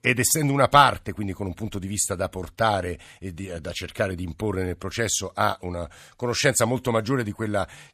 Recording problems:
none

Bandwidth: 14.5 kHz